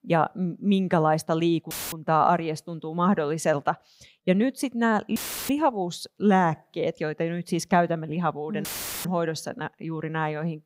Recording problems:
audio cutting out; filled with static; at 1.5 s, at 5 s and at 8.5 s

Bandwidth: 15.5 kHz